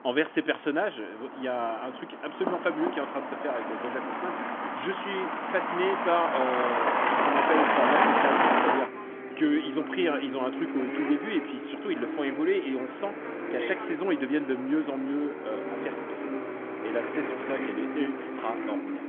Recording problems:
phone-call audio; nothing above 3.5 kHz
traffic noise; very loud; throughout; 1 dB above the speech

